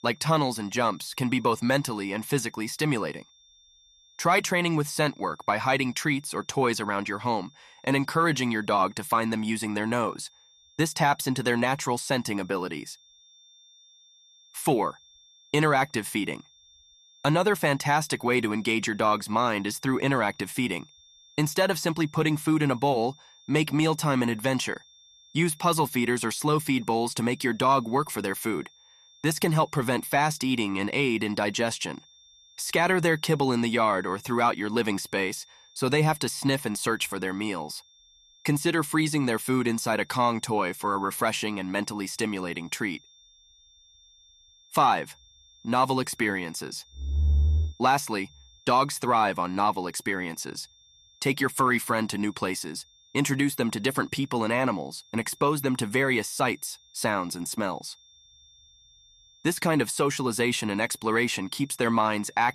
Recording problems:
high-pitched whine; faint; throughout; 3.5 kHz, 30 dB below the speech

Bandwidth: 13.5 kHz